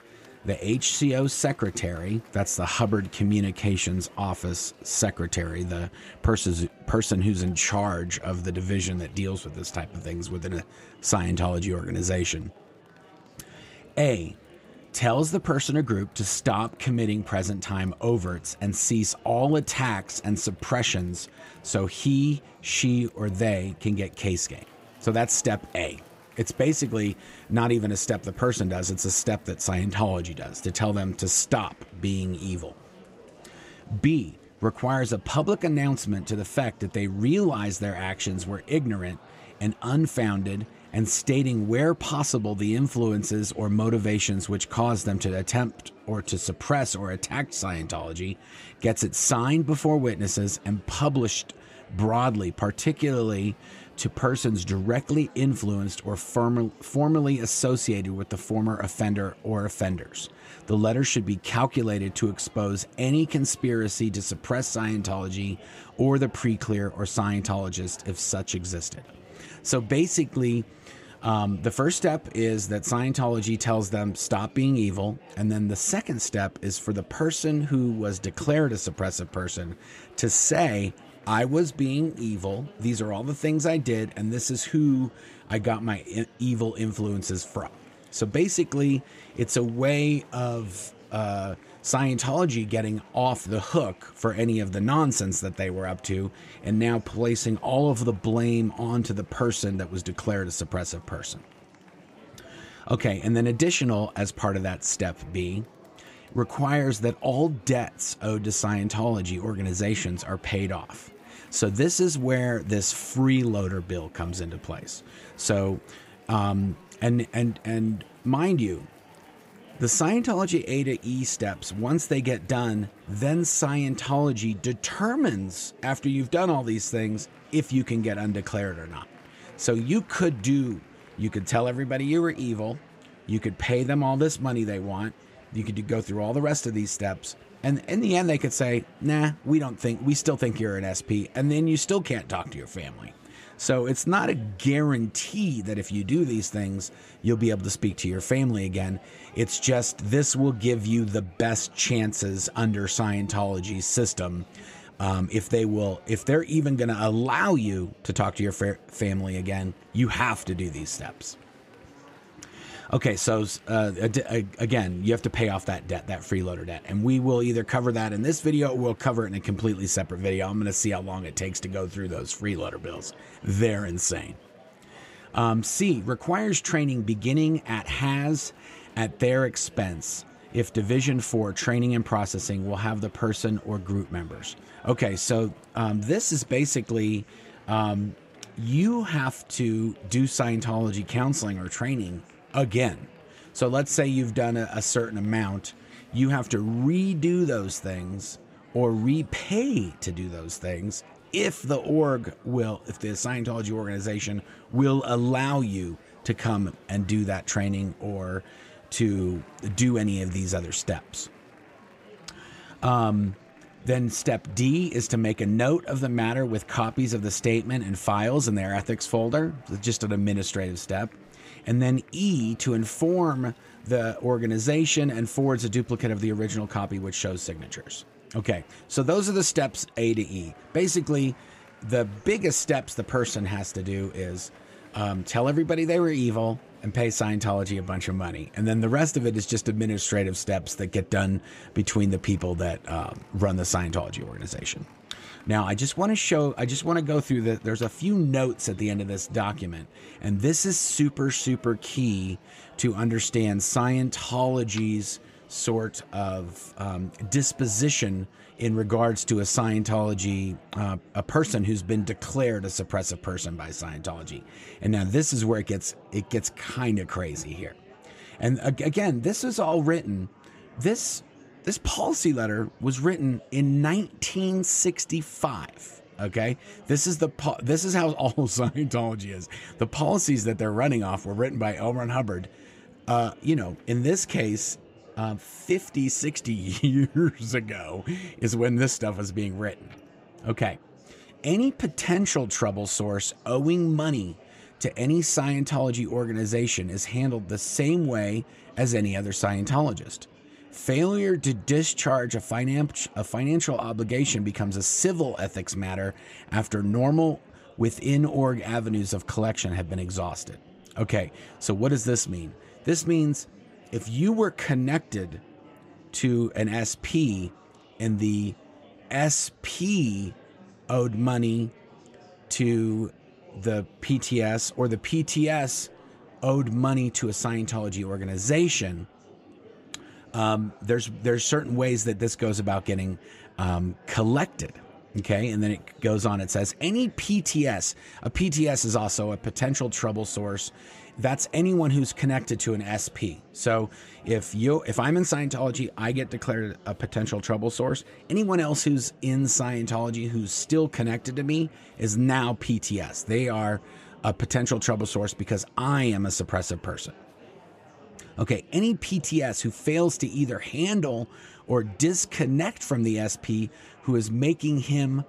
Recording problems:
murmuring crowd; faint; throughout; 25 dB below the speech

